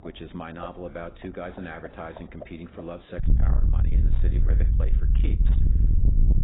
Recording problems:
distortion; heavy; 6 dB below the speech
garbled, watery; badly; nothing above 4 kHz
animal sounds; loud; throughout; 8 dB below the speech
low rumble; loud; from 3 s on; 2 dB below the speech

